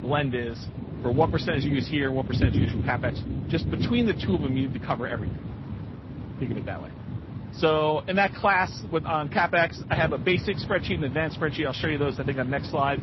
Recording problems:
garbled, watery; slightly; nothing above 5.5 kHz
rain or running water; loud; throughout; 5 dB below the speech

